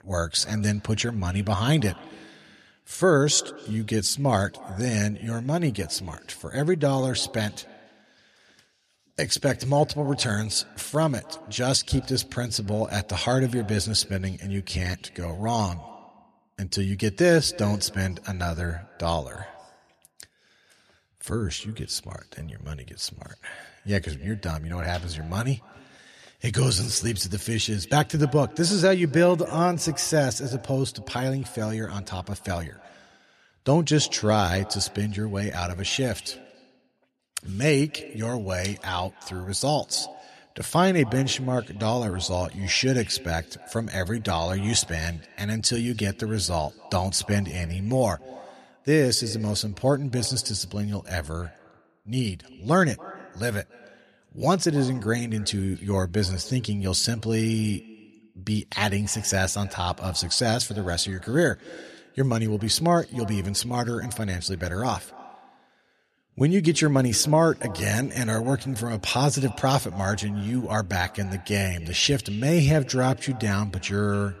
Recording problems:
echo of what is said; faint; throughout; 280 ms later, 20 dB below the speech

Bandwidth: 13.5 kHz